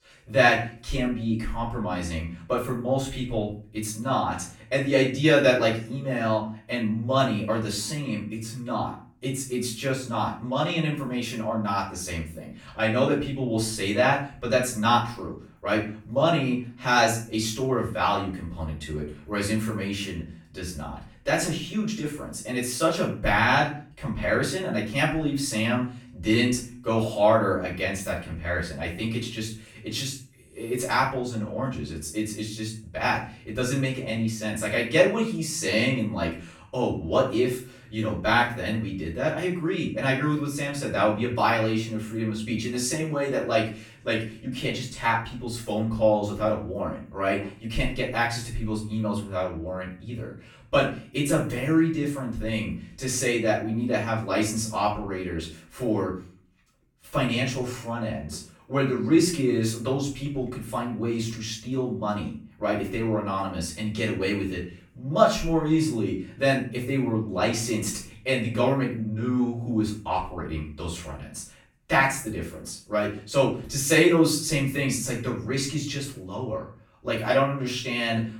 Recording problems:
off-mic speech; far
room echo; noticeable; dies away in 0.4 s

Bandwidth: 18 kHz